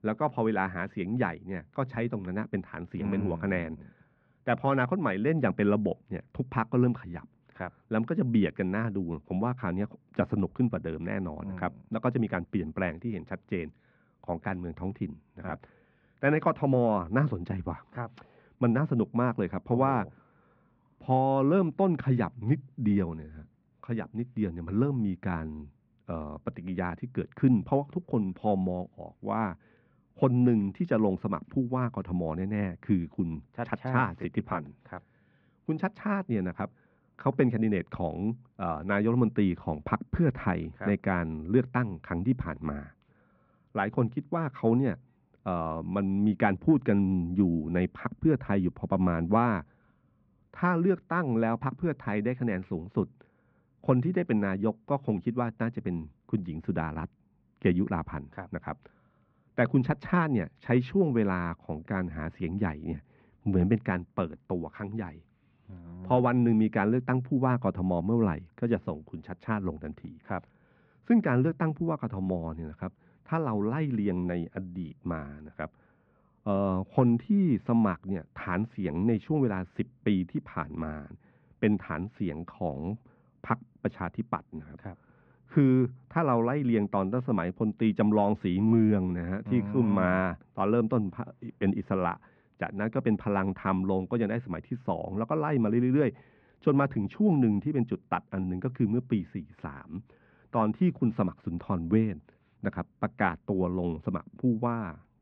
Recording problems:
muffled; very; fading above 2 kHz

